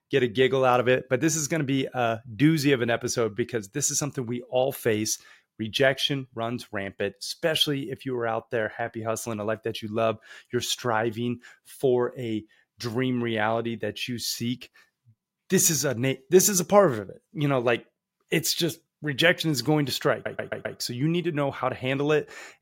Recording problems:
audio stuttering; at 20 s

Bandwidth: 16 kHz